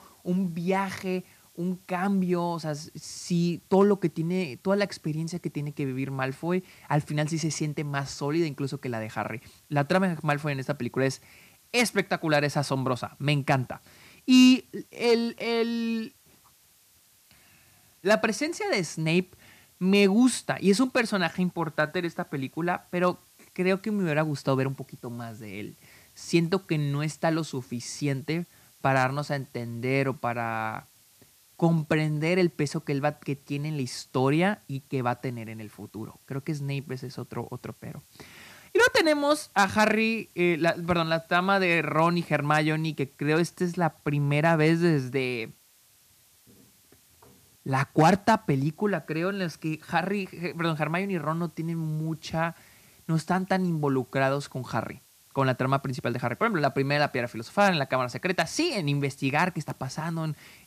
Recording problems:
hiss; faint; throughout; 30 dB below the speech

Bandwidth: 14.5 kHz